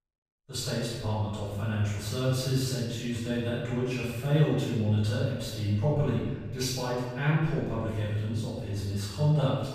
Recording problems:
room echo; strong; dies away in 1.1 s
off-mic speech; far

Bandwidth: 14.5 kHz